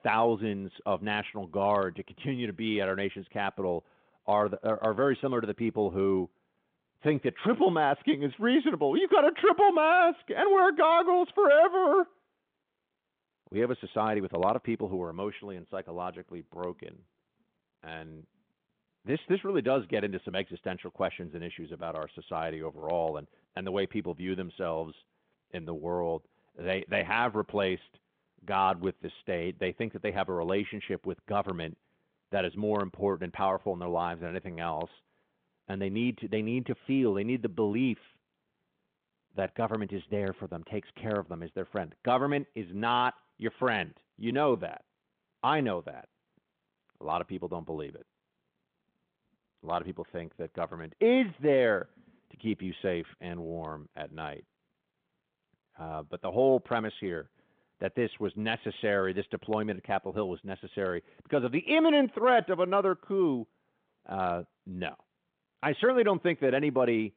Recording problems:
phone-call audio

